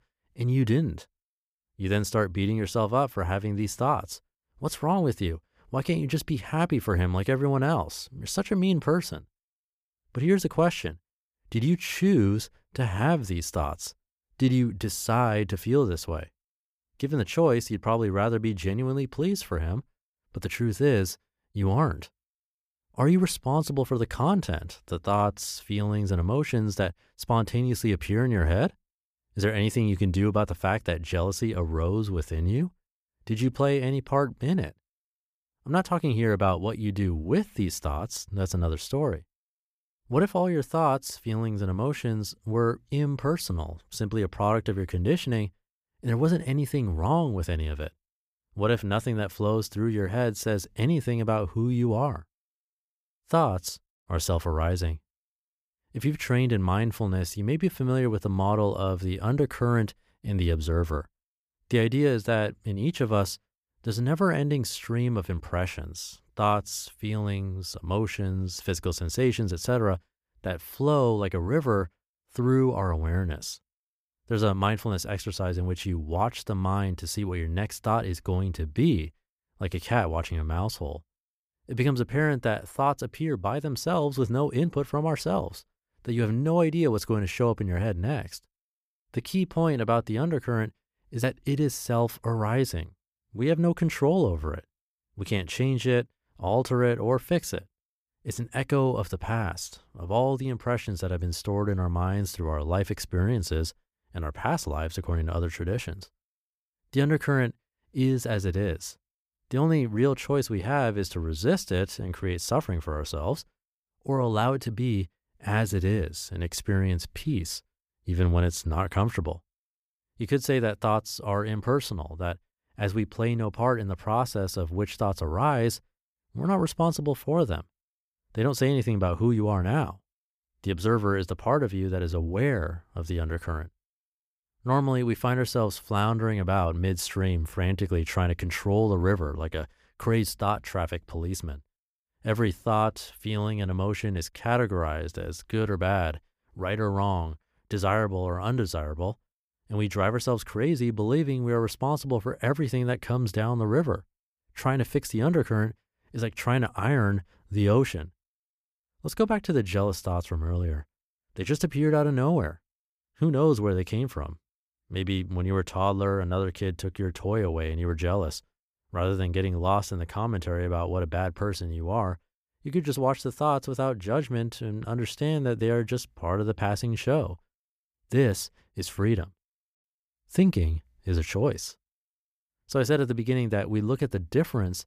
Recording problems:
none

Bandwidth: 15 kHz